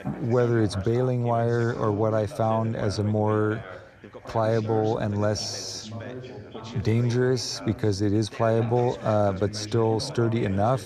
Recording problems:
background chatter; noticeable; throughout; 3 voices, 15 dB below the speech

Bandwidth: 13.5 kHz